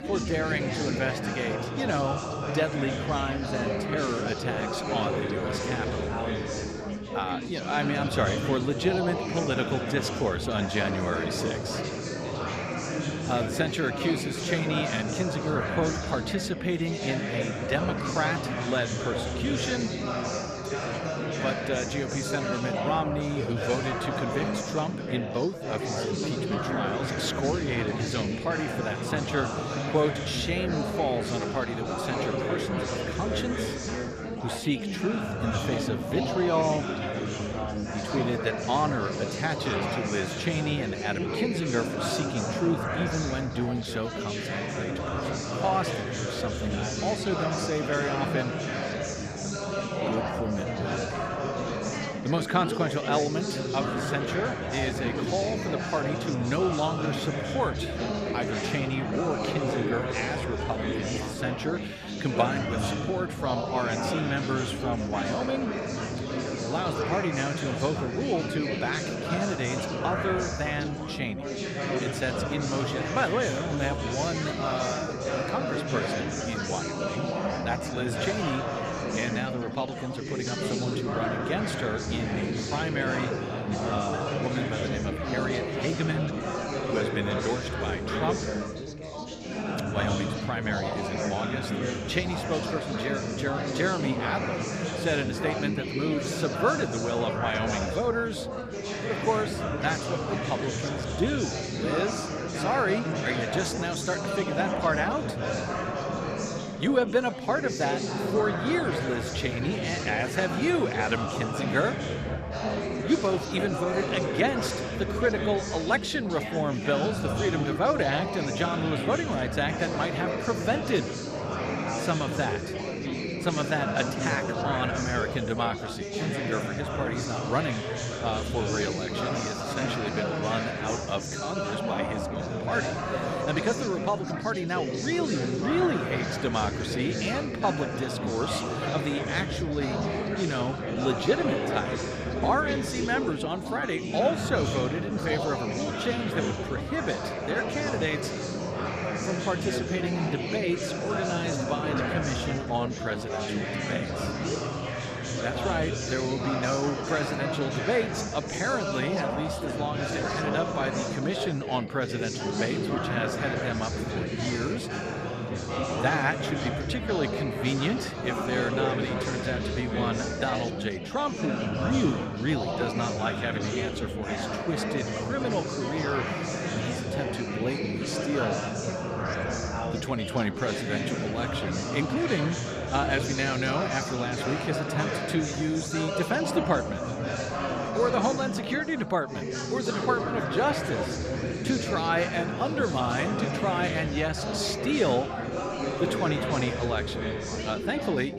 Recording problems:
chatter from many people; loud; throughout; as loud as the speech

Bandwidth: 14 kHz